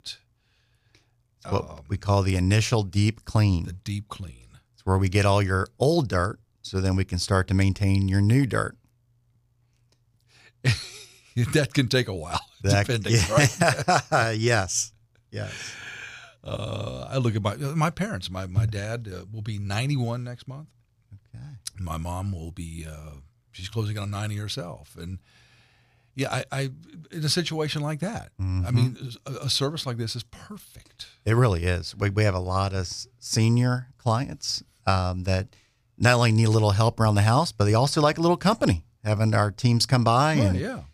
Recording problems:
none

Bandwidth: 15 kHz